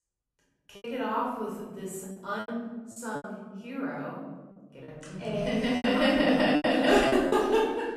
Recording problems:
off-mic speech; far
room echo; noticeable; dies away in 1.4 s
choppy; very; 11% of the speech affected

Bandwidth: 14 kHz